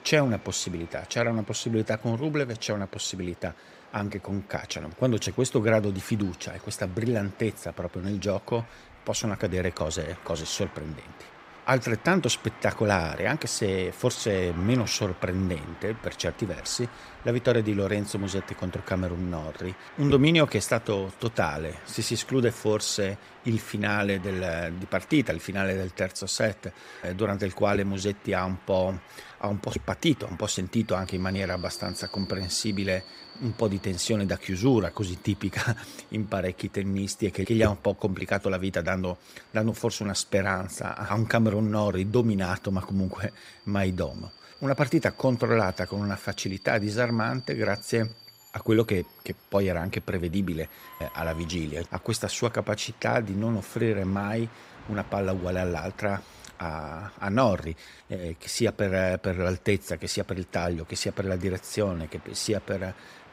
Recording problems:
train or aircraft noise; noticeable; throughout; 20 dB below the speech

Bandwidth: 15.5 kHz